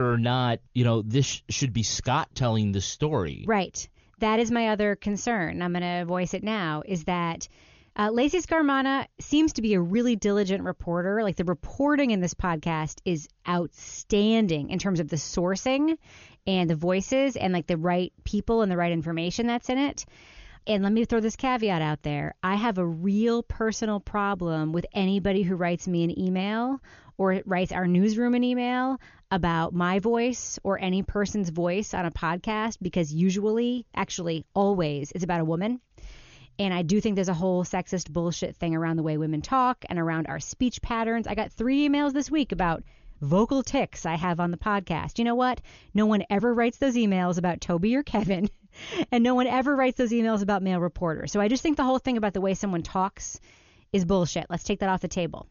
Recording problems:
high frequencies cut off; noticeable; nothing above 6.5 kHz
abrupt cut into speech; at the start

